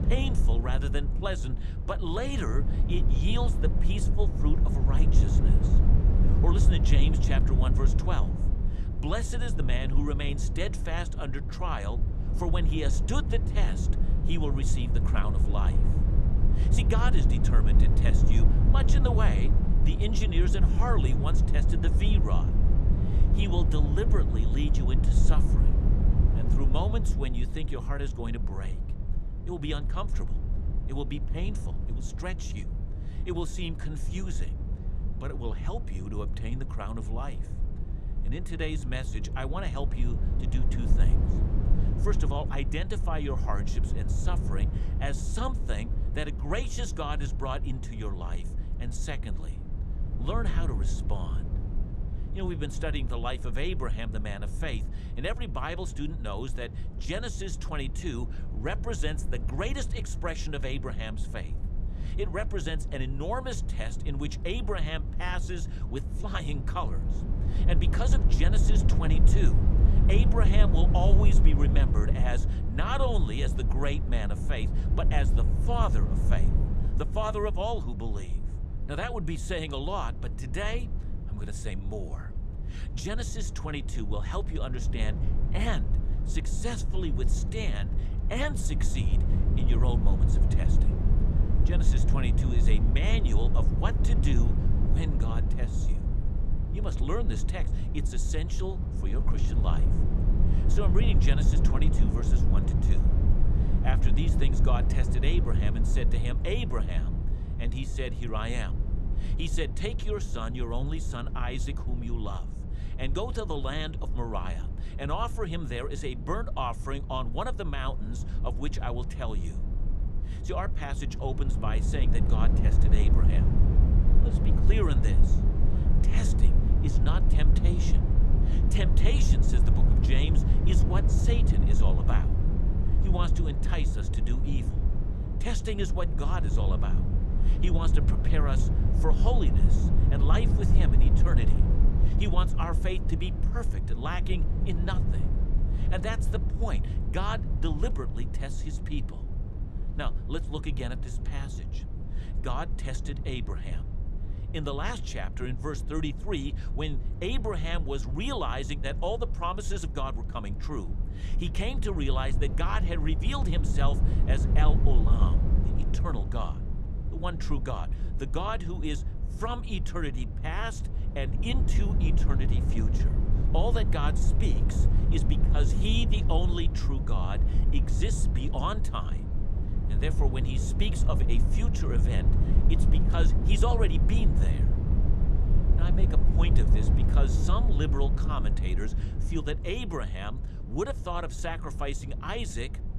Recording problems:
low rumble; loud; throughout; 6 dB below the speech

